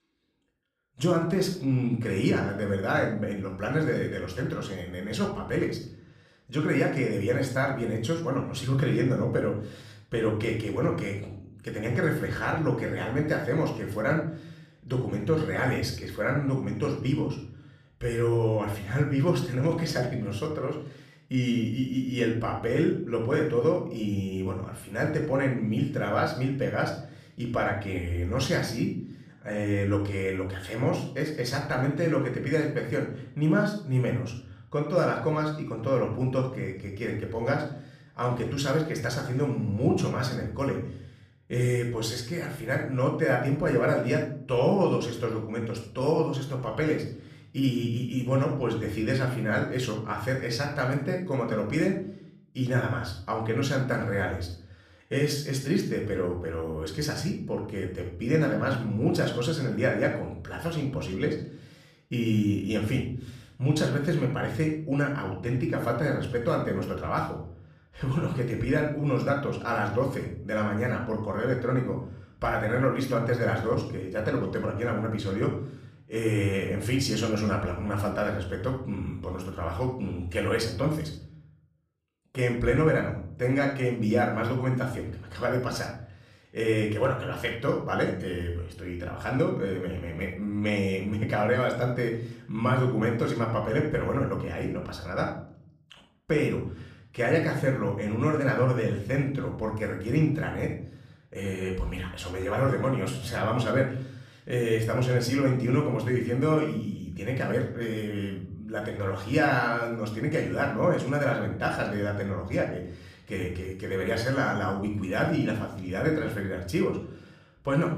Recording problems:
room echo; slight; dies away in 0.5 s
off-mic speech; somewhat distant

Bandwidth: 14.5 kHz